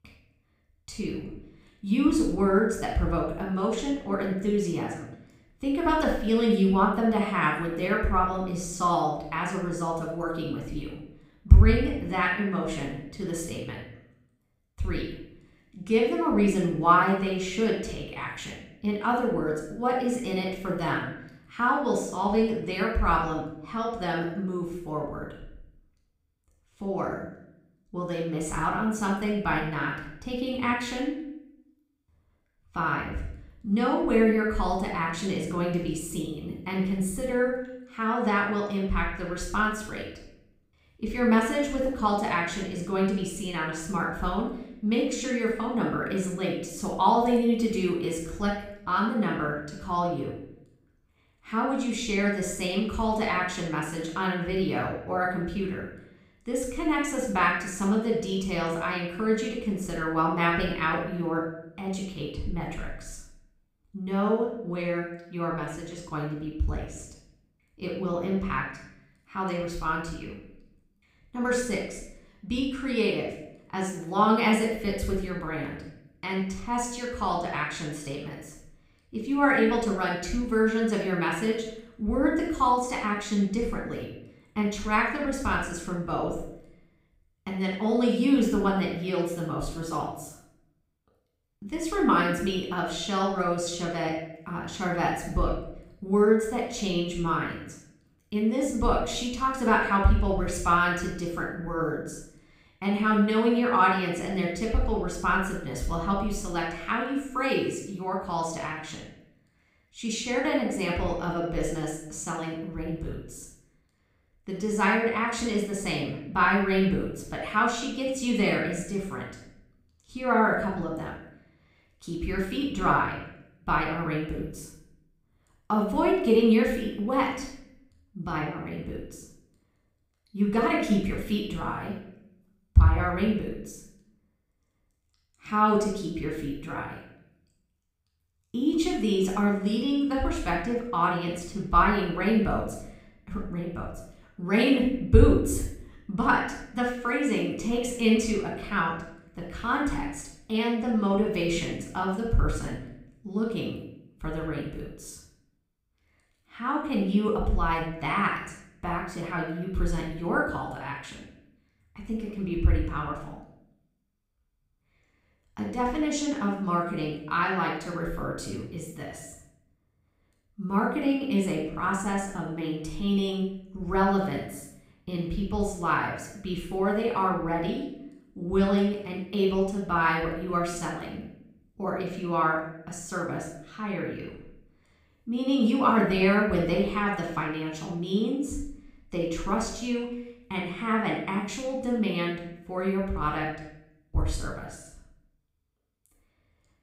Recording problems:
room echo; noticeable; dies away in 0.6 s
off-mic speech; somewhat distant

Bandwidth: 15.5 kHz